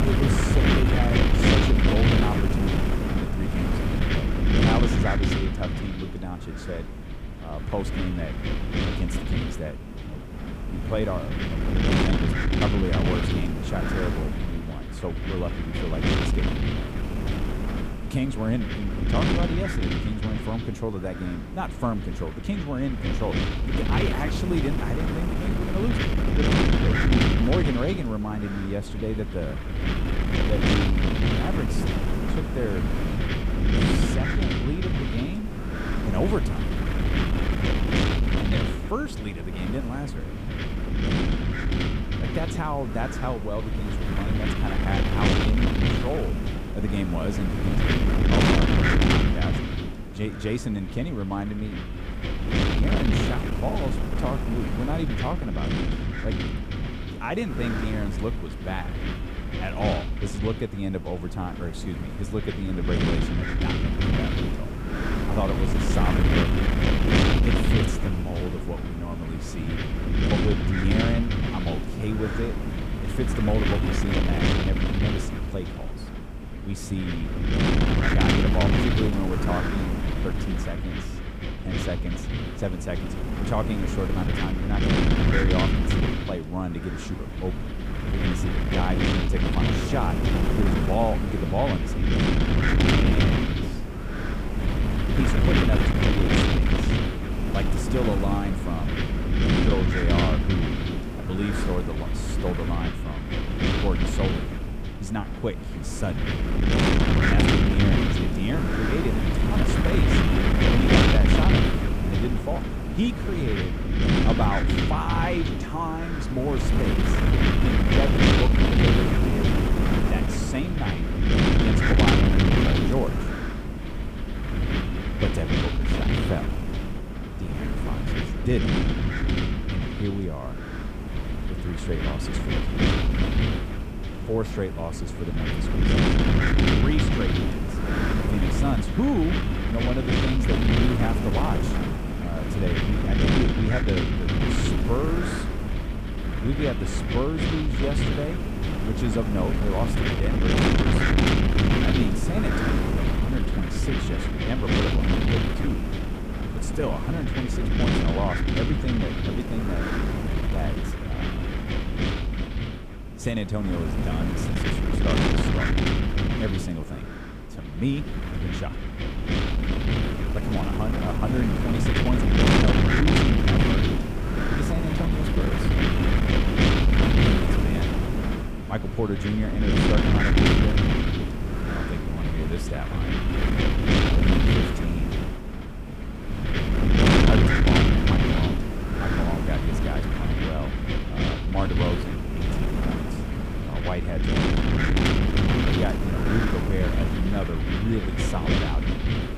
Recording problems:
wind noise on the microphone; heavy; 4 dB above the speech

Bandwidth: 15 kHz